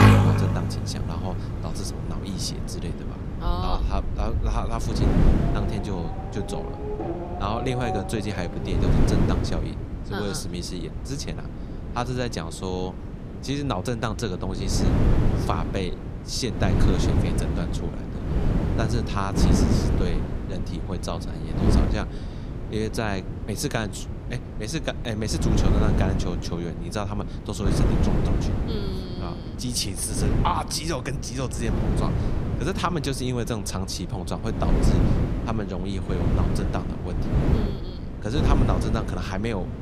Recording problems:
traffic noise; very loud; until 8.5 s; 2 dB above the speech
wind noise on the microphone; heavy; 3 dB below the speech

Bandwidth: 14.5 kHz